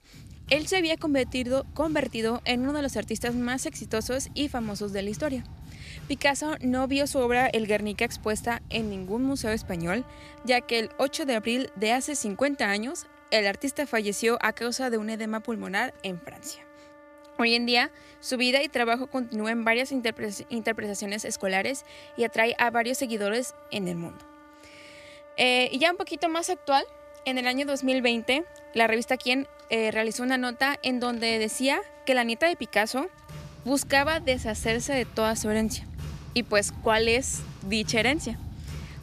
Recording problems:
background music; noticeable; throughout; 20 dB below the speech

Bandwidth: 14.5 kHz